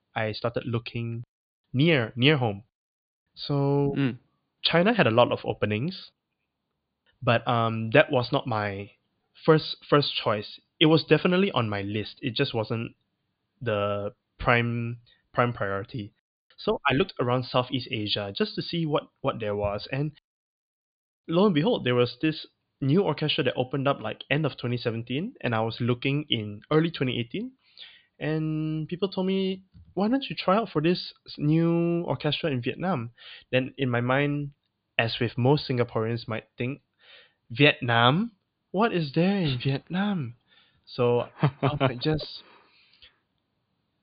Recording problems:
high frequencies cut off; severe; nothing above 4.5 kHz

